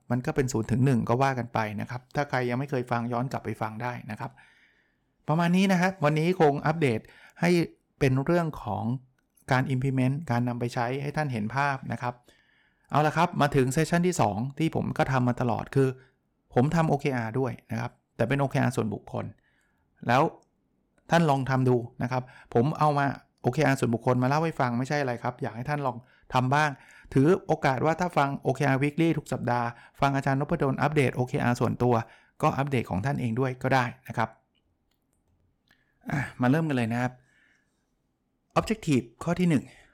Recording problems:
none

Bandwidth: 18 kHz